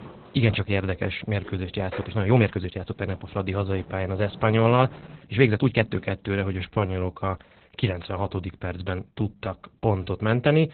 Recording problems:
garbled, watery; badly; nothing above 4 kHz
household noises; noticeable; until 7 s; 20 dB below the speech
uneven, jittery; strongly; from 2 to 10 s

